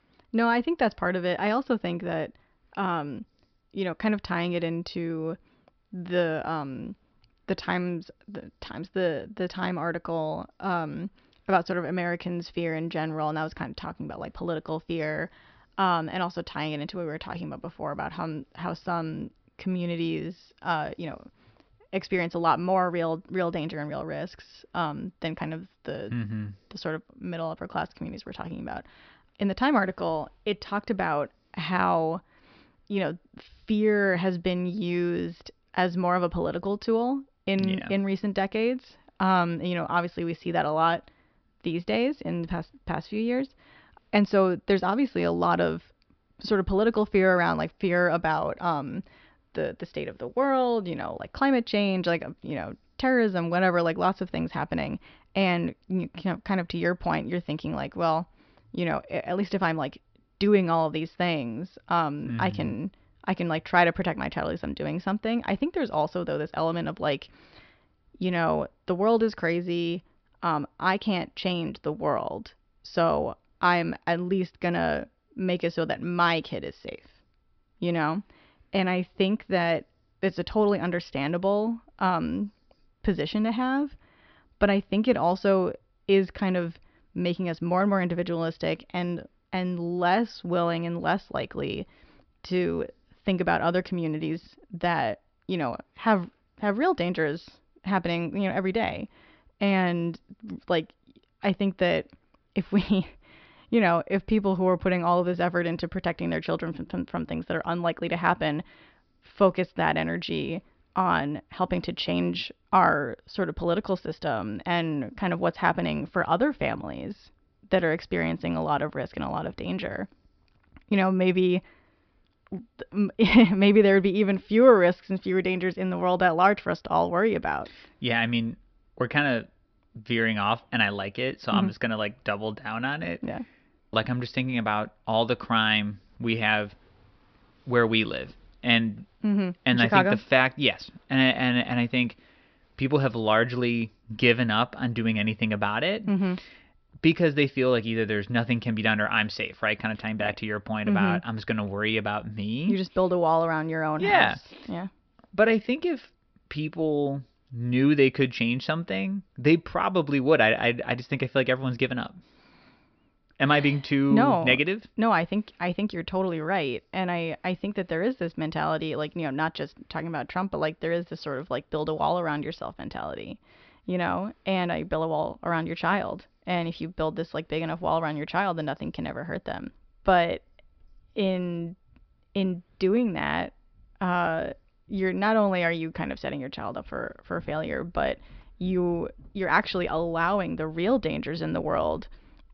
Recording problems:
high frequencies cut off; noticeable; nothing above 5.5 kHz

